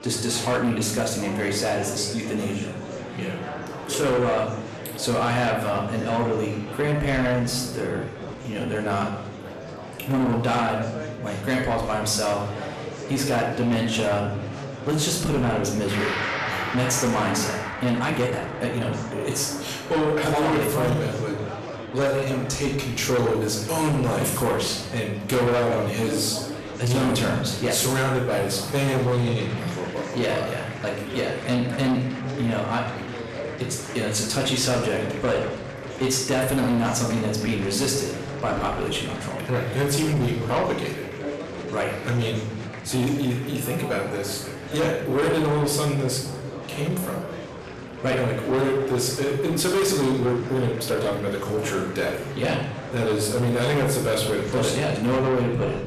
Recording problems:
distortion; heavy; 8 dB below the speech
room echo; noticeable; dies away in 0.7 s
off-mic speech; somewhat distant
background music; noticeable; throughout; 15 dB below the speech
murmuring crowd; noticeable; throughout; 10 dB below the speech
uneven, jittery; strongly; from 8 to 51 s

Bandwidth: 14 kHz